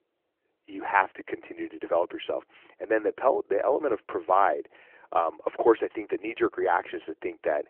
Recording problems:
phone-call audio; nothing above 3 kHz

